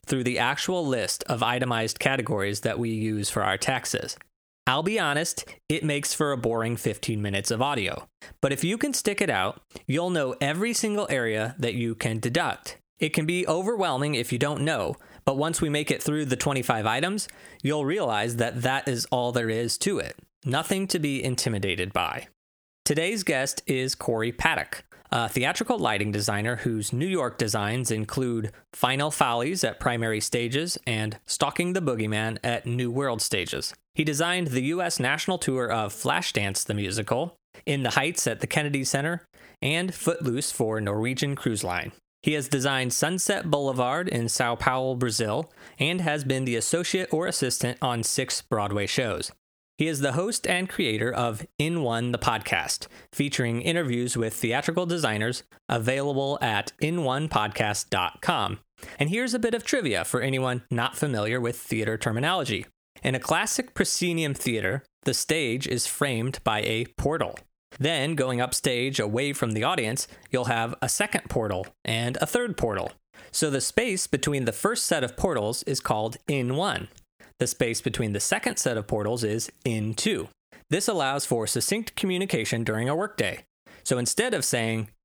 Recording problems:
squashed, flat; heavily

